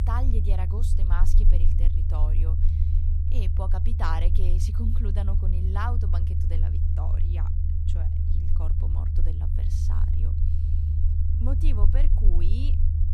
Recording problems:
low rumble; loud; throughout; 3 dB below the speech

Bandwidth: 13.5 kHz